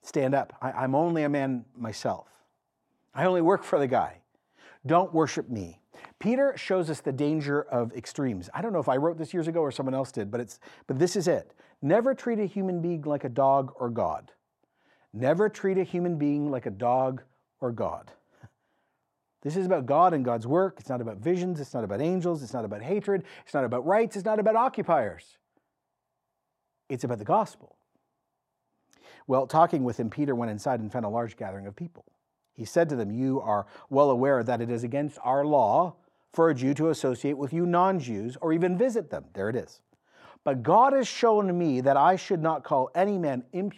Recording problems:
none

